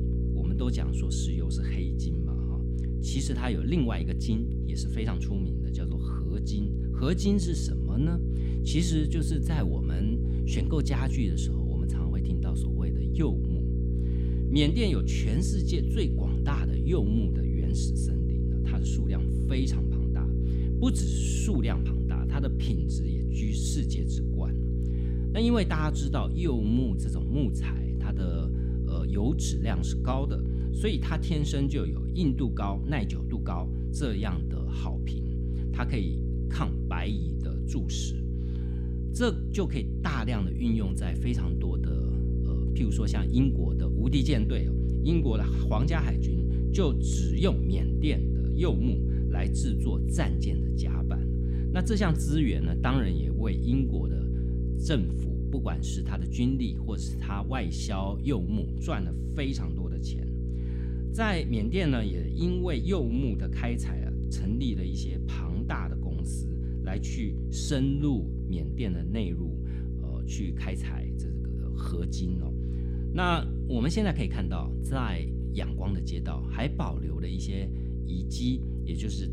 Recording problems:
electrical hum; loud; throughout; 60 Hz, 5 dB below the speech

